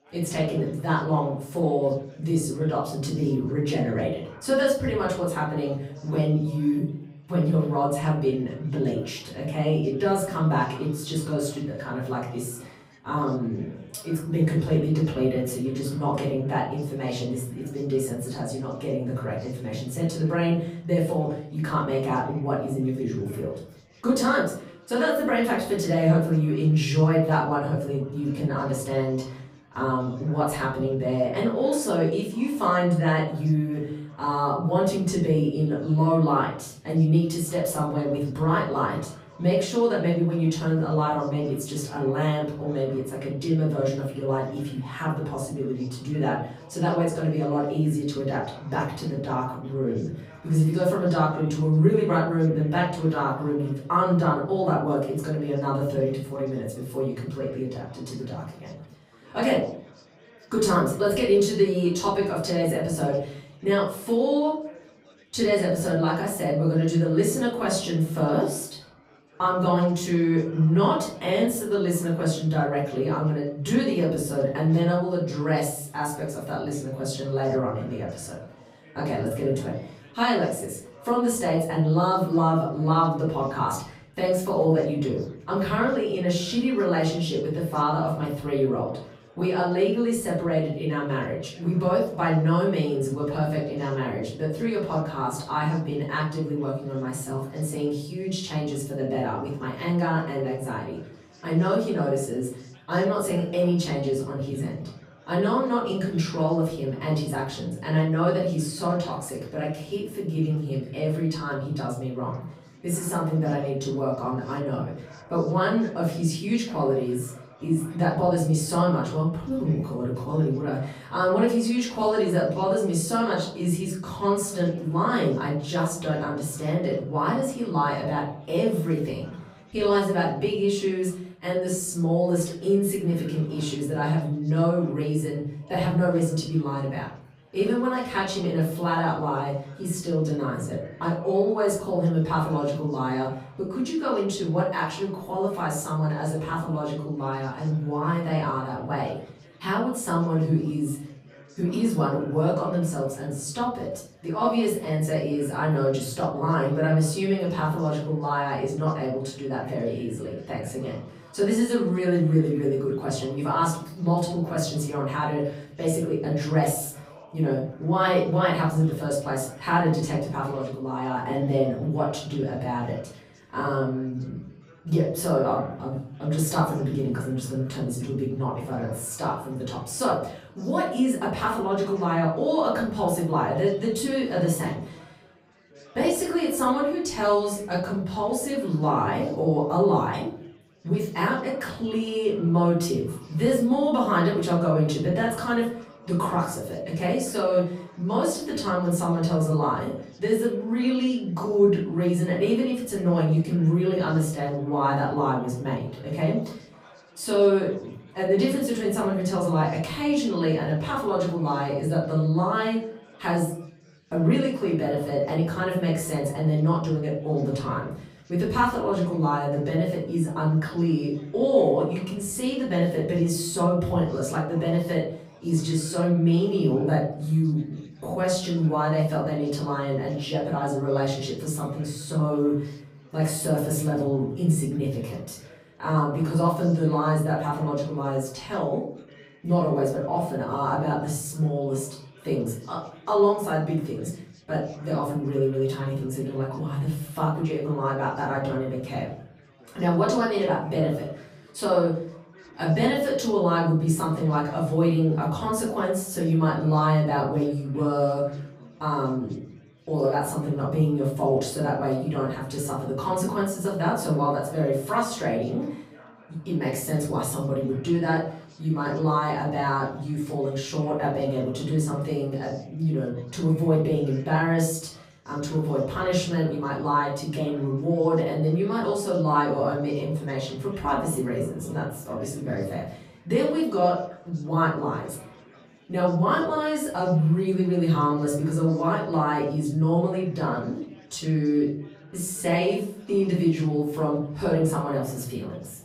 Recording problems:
off-mic speech; far
room echo; noticeable; dies away in 0.5 s
chatter from many people; faint; throughout; 25 dB below the speech

